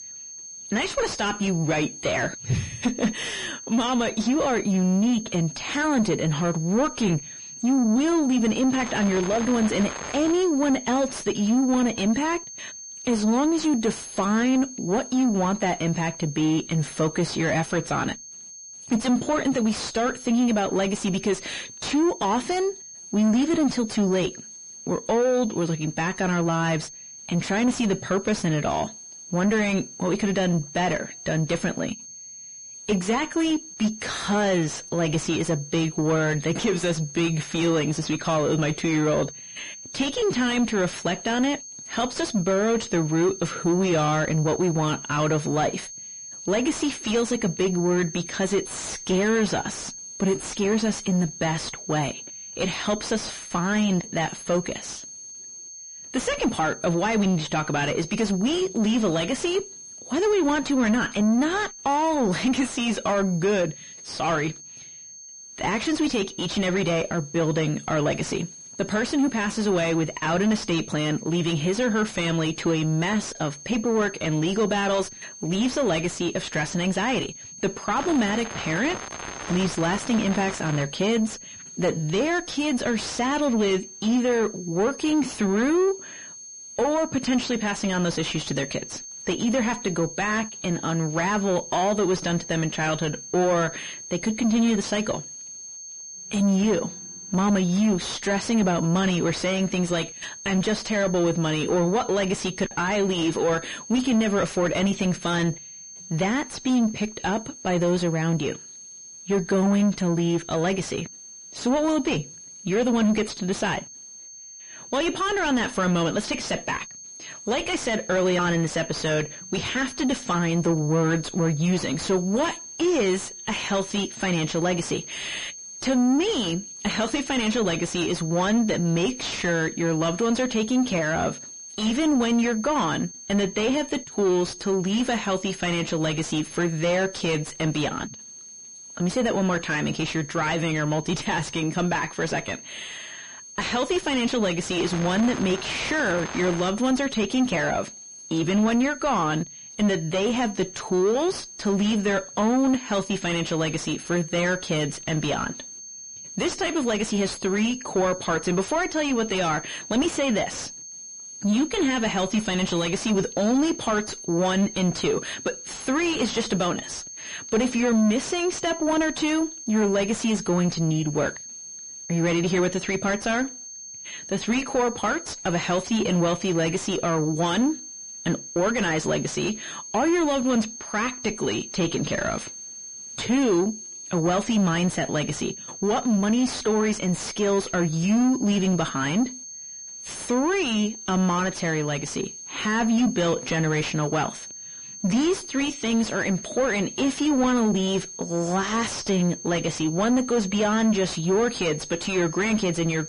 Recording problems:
distortion; heavy; 6 dB below the speech
garbled, watery; slightly; nothing above 10.5 kHz
high-pitched whine; noticeable; throughout; 6.5 kHz, 15 dB below the speech
crackling; noticeable; from 8.5 to 10 s, from 1:18 to 1:21 and from 2:25 to 2:27; 10 dB below the speech

